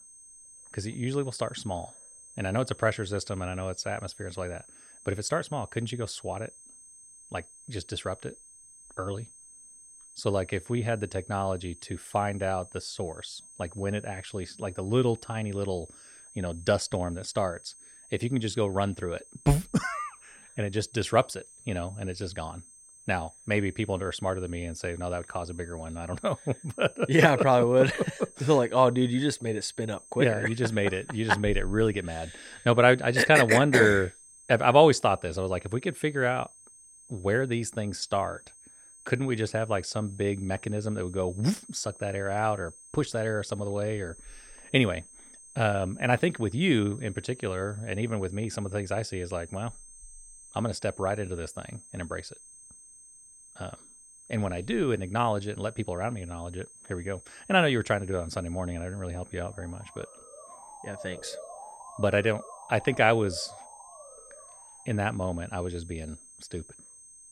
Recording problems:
high-pitched whine; faint; throughout; 8.5 kHz, 20 dB below the speech
siren; faint; from 59 s to 1:05; peak 15 dB below the speech

